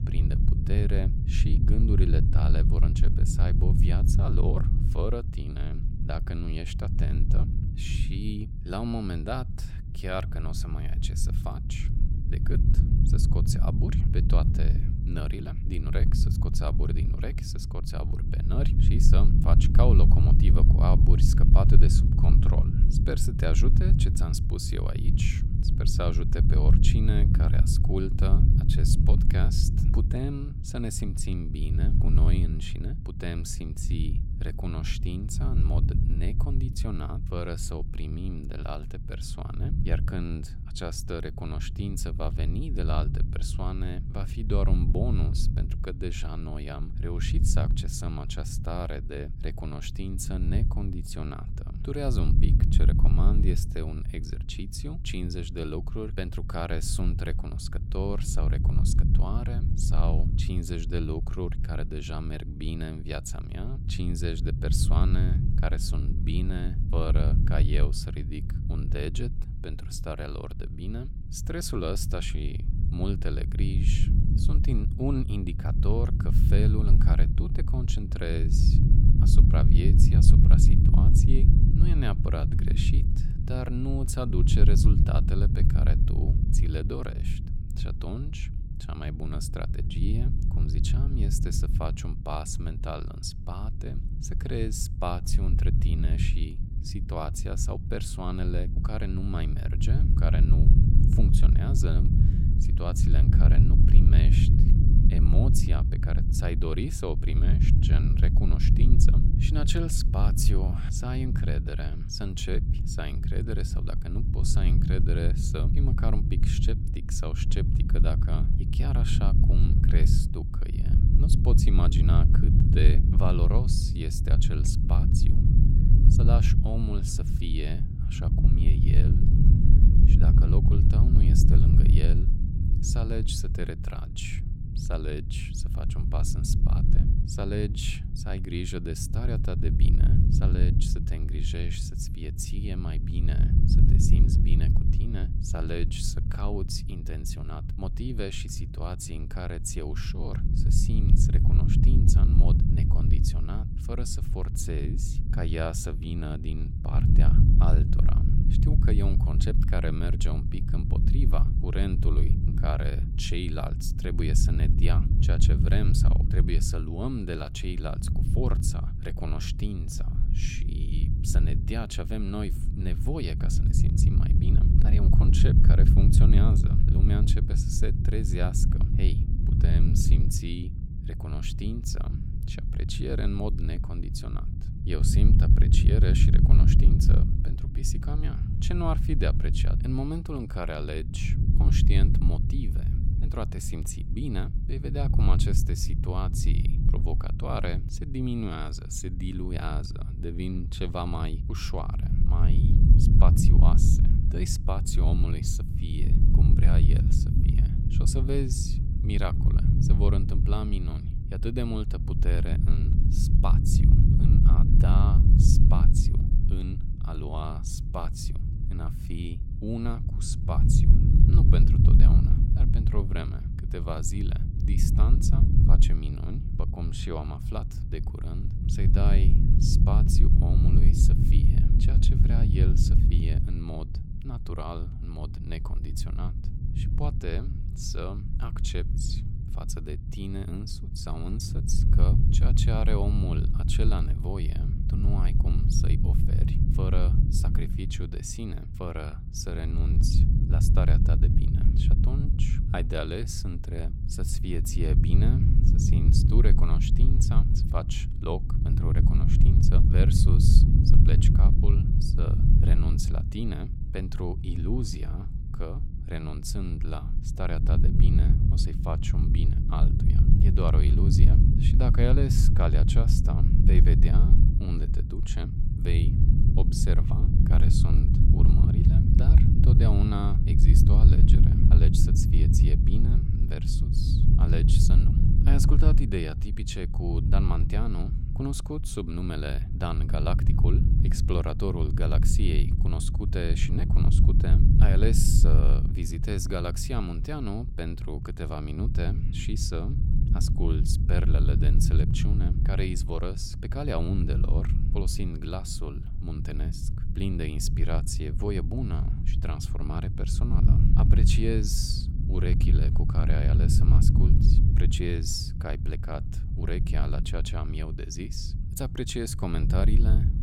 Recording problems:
low rumble; loud; throughout; 2 dB below the speech

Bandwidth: 16.5 kHz